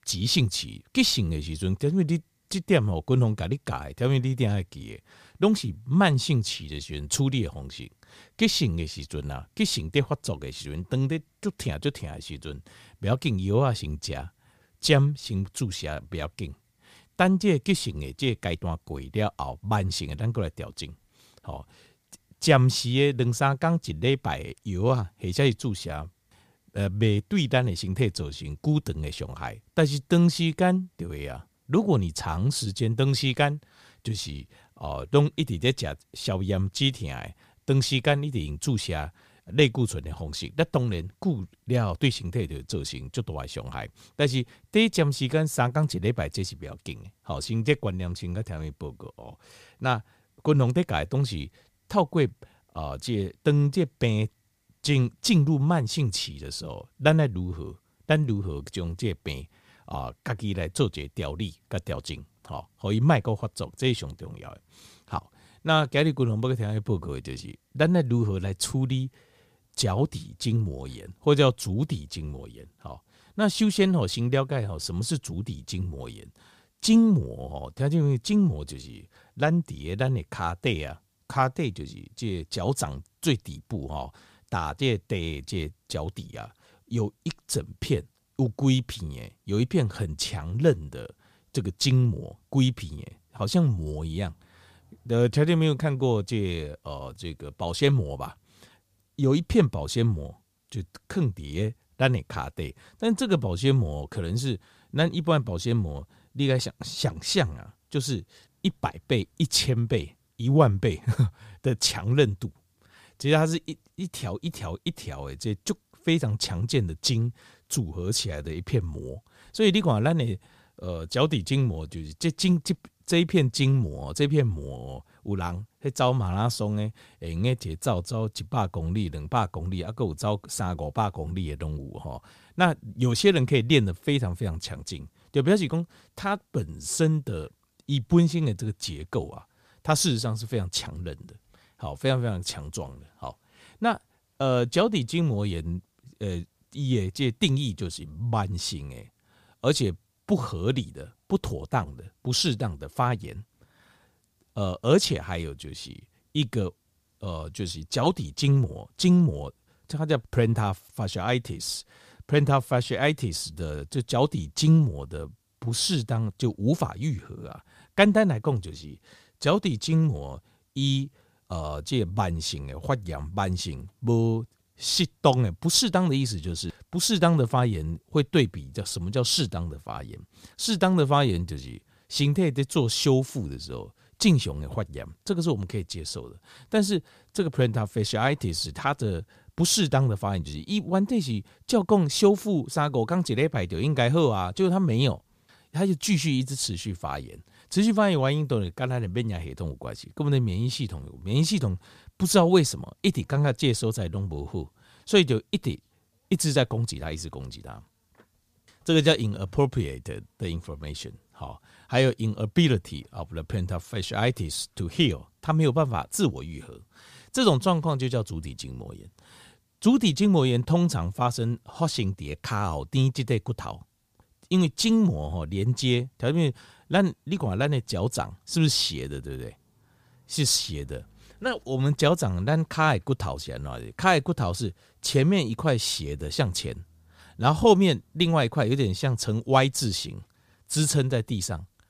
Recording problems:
none

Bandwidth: 15 kHz